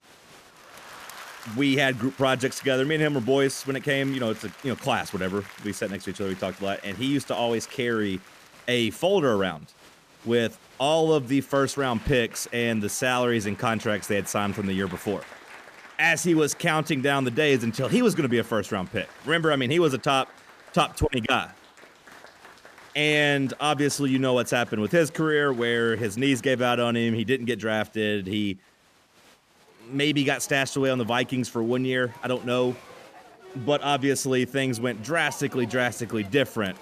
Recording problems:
crowd noise; faint; throughout; 20 dB below the speech

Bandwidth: 14.5 kHz